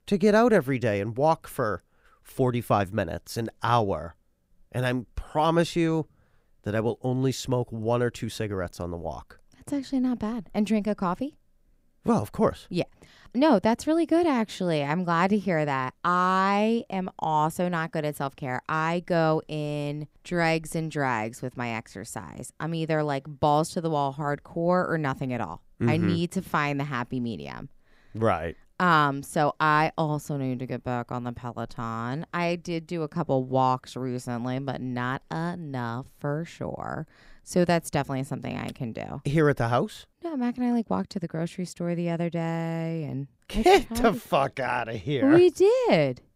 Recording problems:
none

